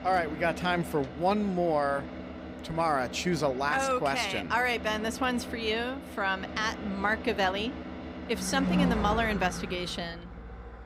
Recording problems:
traffic noise; loud; throughout; 8 dB below the speech

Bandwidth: 15.5 kHz